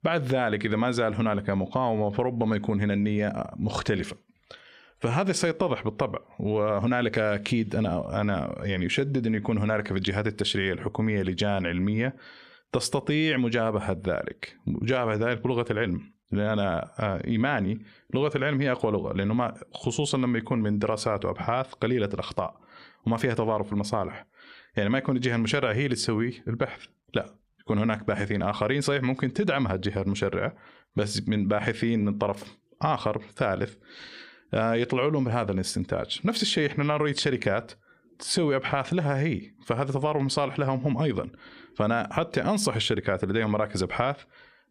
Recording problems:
squashed, flat; heavily

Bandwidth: 14.5 kHz